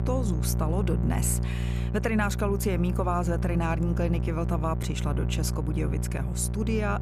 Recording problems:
electrical hum; loud; throughout; 60 Hz, 9 dB below the speech

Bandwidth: 14.5 kHz